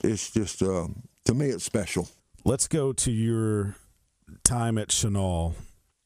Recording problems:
squashed, flat; somewhat

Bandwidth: 15 kHz